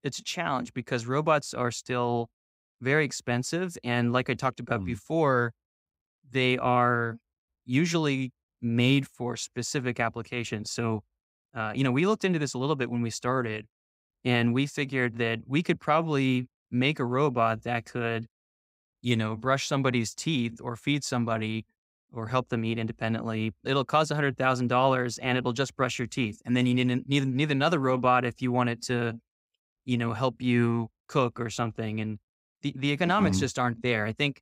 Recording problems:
none

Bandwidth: 15.5 kHz